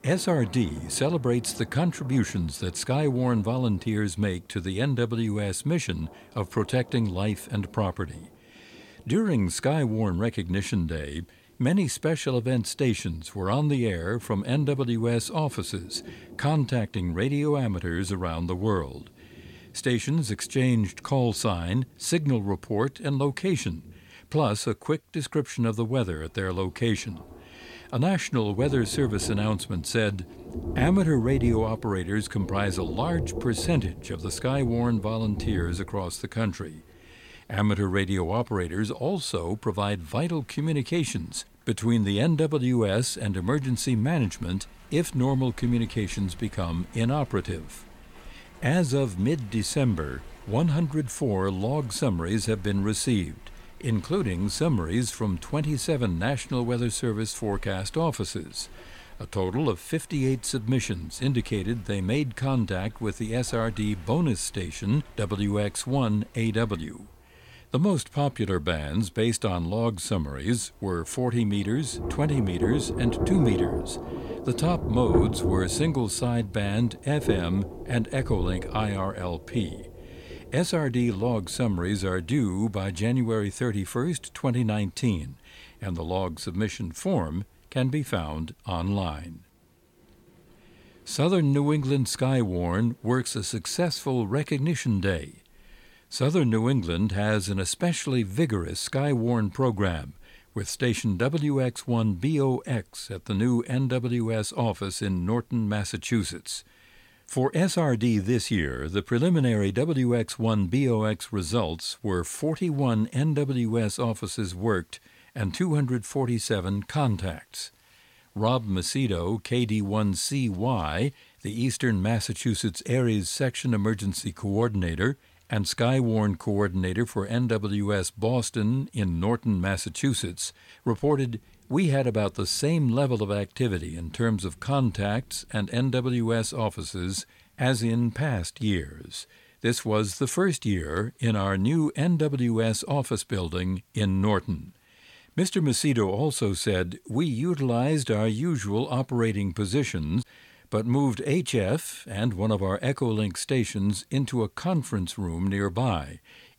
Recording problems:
rain or running water; noticeable; throughout; 10 dB below the speech

